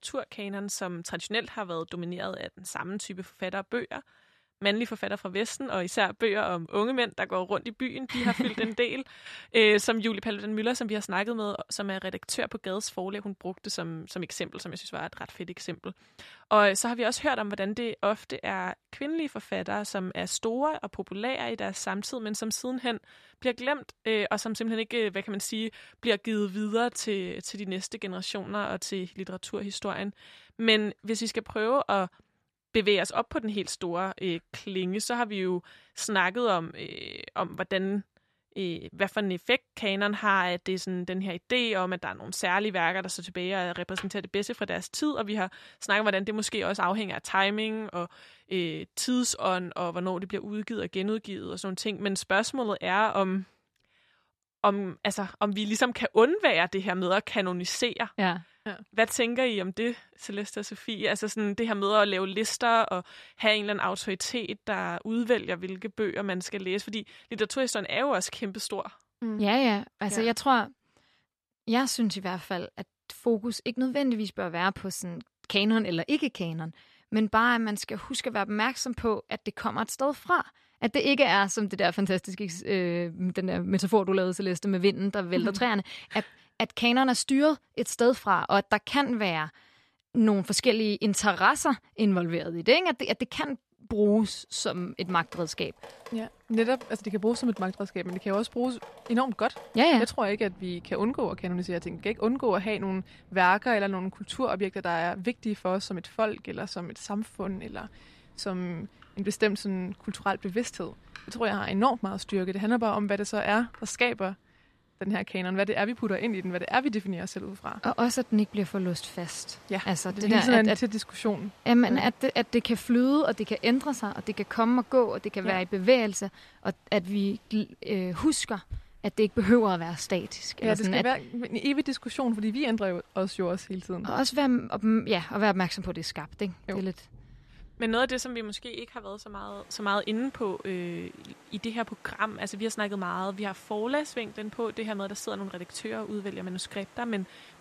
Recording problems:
rain or running water; faint; from 1:35 on; 25 dB below the speech

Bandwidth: 13.5 kHz